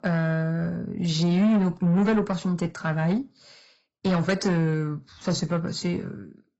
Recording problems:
garbled, watery; badly; nothing above 7.5 kHz
distortion; slight; 10 dB below the speech

